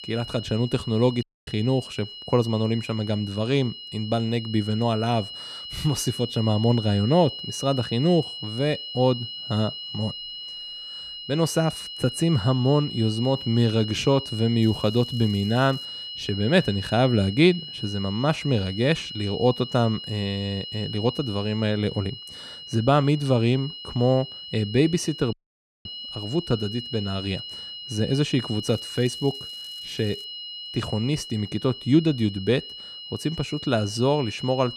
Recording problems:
high-pitched whine; loud; throughout; 3 kHz, 10 dB below the speech
crackling; faint; from 15 to 16 s and from 29 to 30 s; 30 dB below the speech
audio cutting out; at 1 s and at 25 s for 0.5 s

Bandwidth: 14 kHz